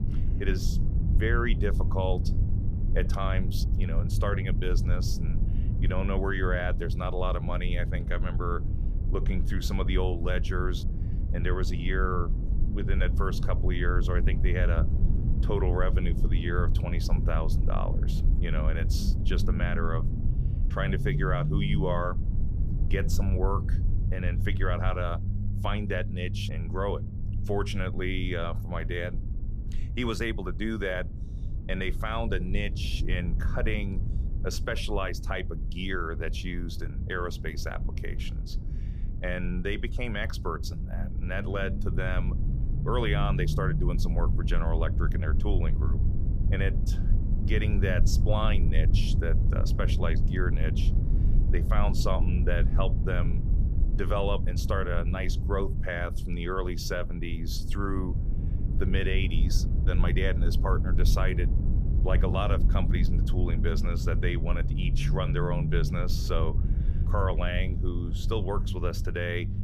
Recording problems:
low rumble; loud; throughout; 10 dB below the speech

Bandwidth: 14.5 kHz